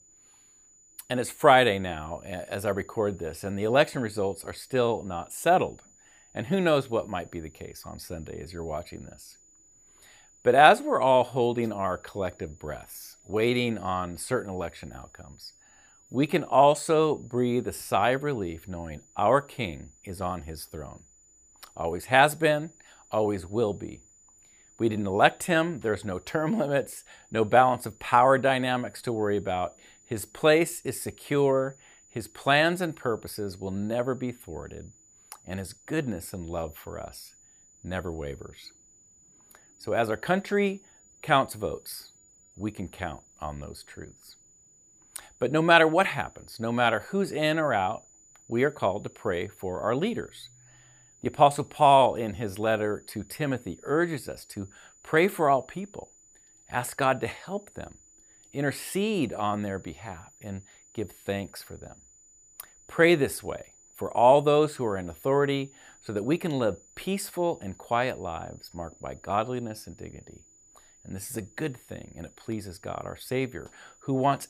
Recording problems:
high-pitched whine; faint; throughout; 7 kHz, 30 dB below the speech

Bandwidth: 15 kHz